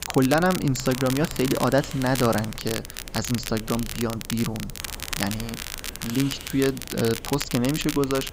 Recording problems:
high frequencies cut off; noticeable; nothing above 7.5 kHz
crackle, like an old record; loud; 8 dB below the speech
hiss; noticeable; throughout; 15 dB below the speech

